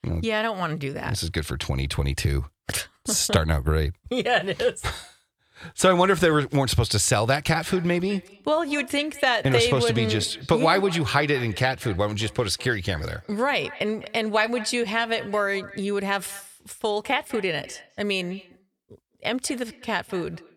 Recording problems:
echo of what is said; faint; from 7.5 s on; 200 ms later, 20 dB below the speech

